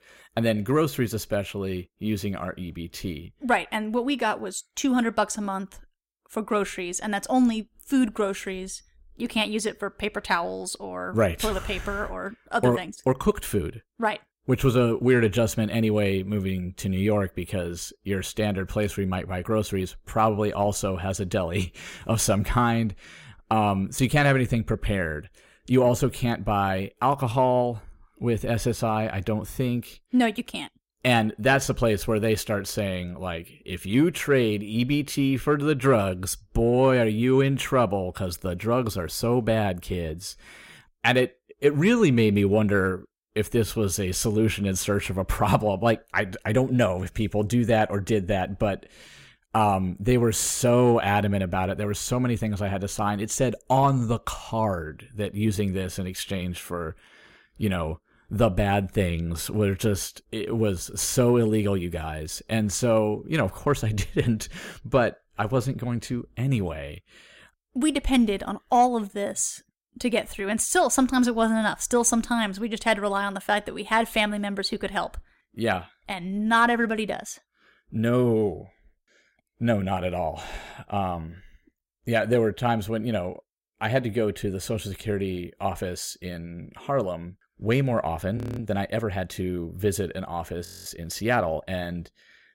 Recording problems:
audio freezing; at 1:28 and at 1:31

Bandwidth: 16 kHz